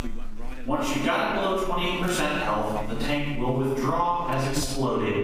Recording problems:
room echo; strong; dies away in 1.1 s
off-mic speech; far
squashed, flat; somewhat
electrical hum; noticeable; throughout; 50 Hz, 20 dB below the speech
voice in the background; noticeable; throughout; 20 dB below the speech

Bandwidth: 15.5 kHz